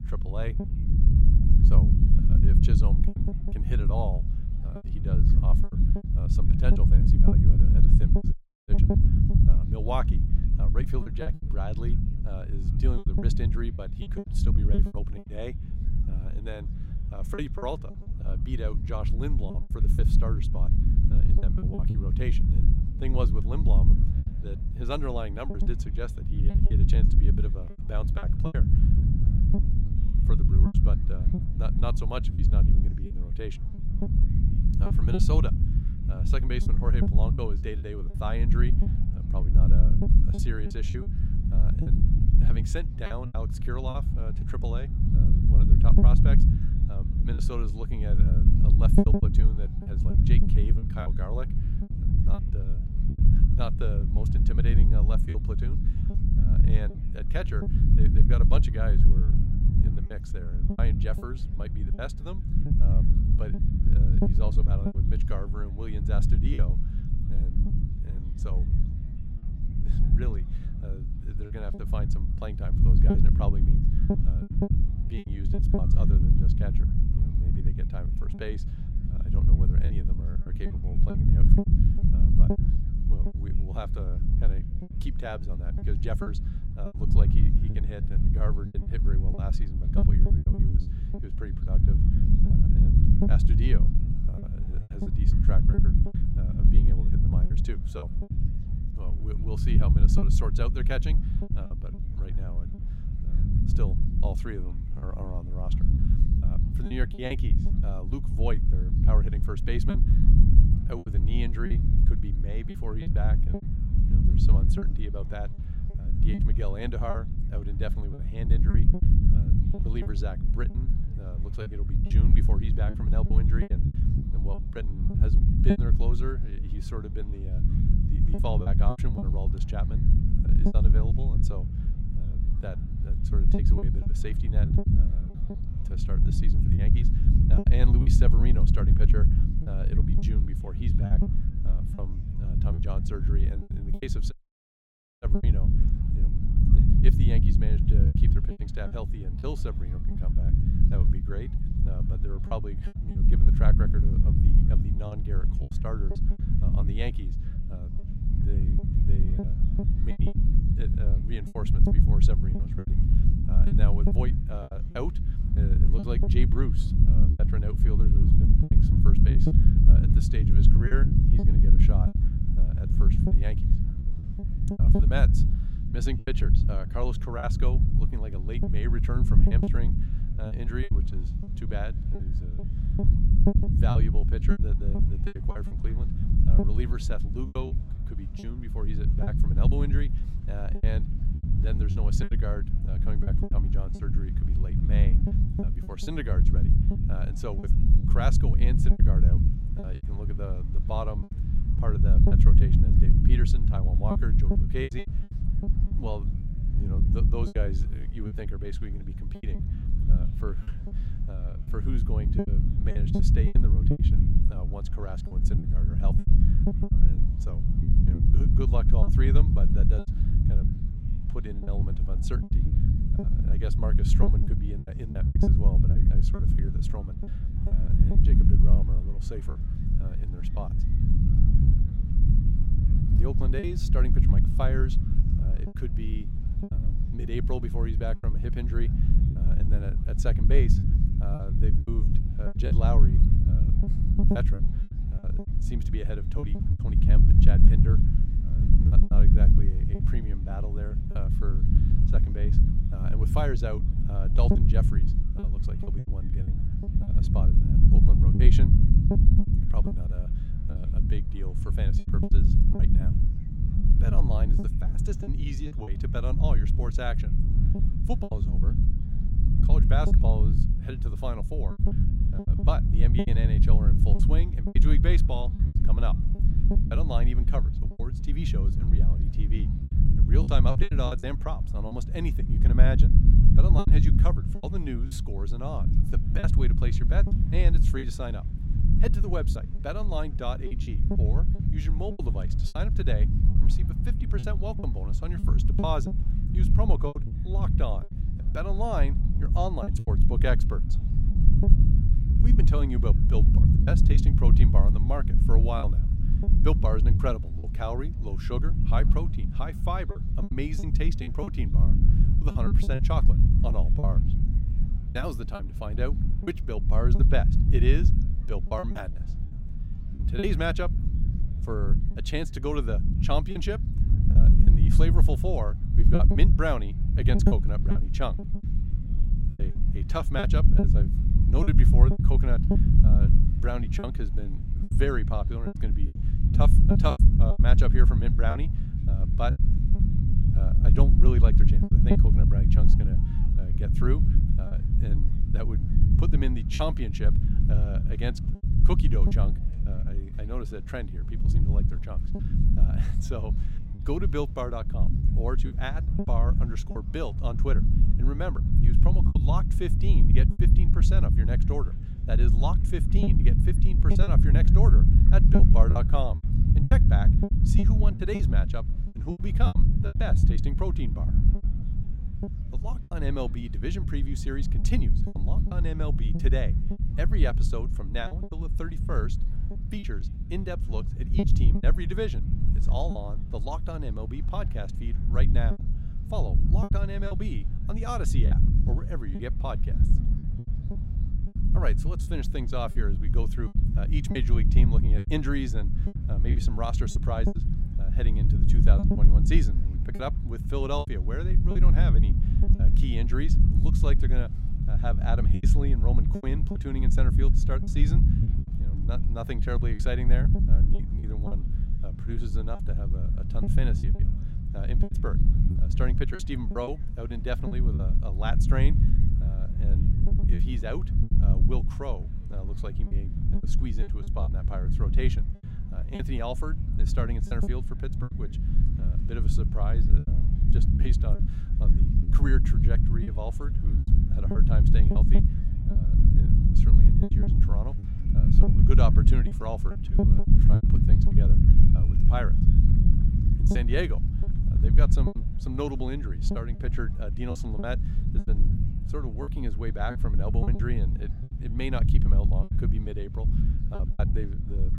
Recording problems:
low rumble; loud; throughout; 2 dB below the speech
murmuring crowd; faint; throughout; 25 dB below the speech
choppy; very; 7% of the speech affected
audio cutting out; at 8.5 s and at 2:24 for 1 s

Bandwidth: 16 kHz